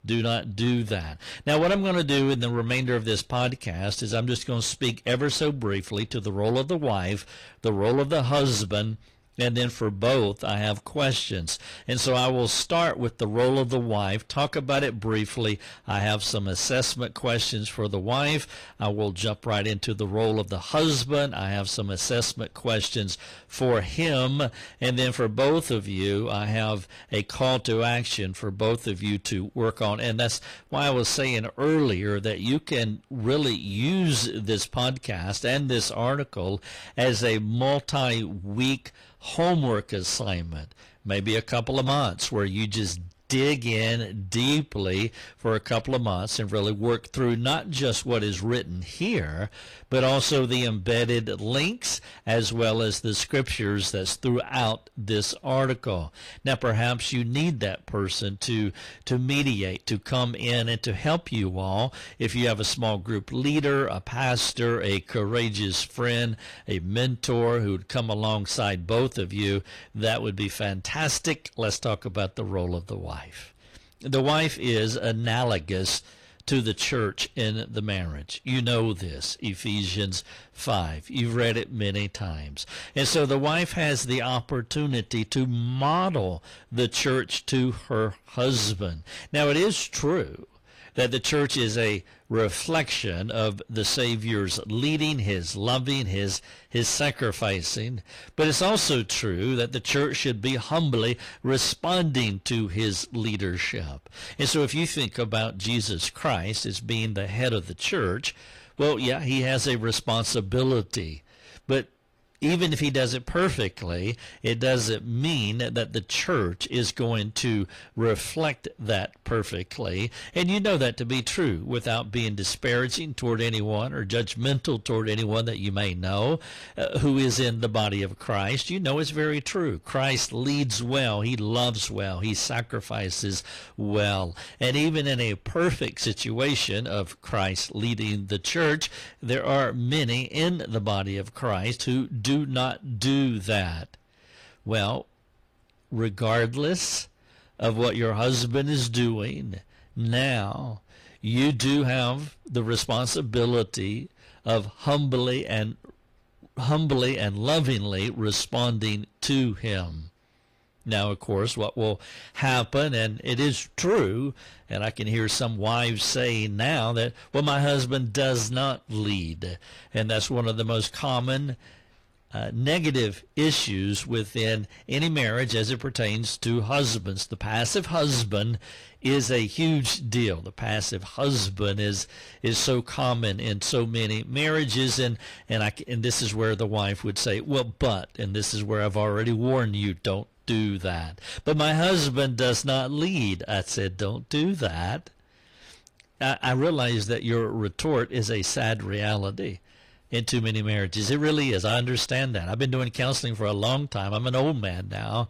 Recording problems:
distortion; slight; 10 dB below the speech
garbled, watery; slightly; nothing above 18.5 kHz

